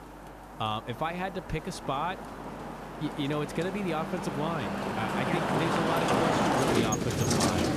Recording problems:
traffic noise; very loud; throughout; 4 dB above the speech
electrical hum; faint; throughout; 50 Hz, 30 dB below the speech
hiss; faint; throughout; 25 dB below the speech

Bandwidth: 14.5 kHz